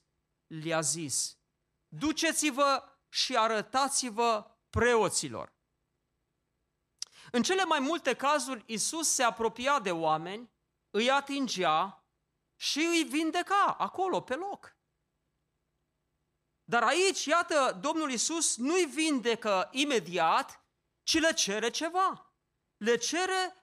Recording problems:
none

